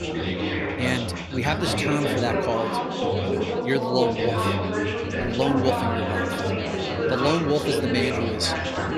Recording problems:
chatter from many people; very loud; throughout; 1 dB above the speech

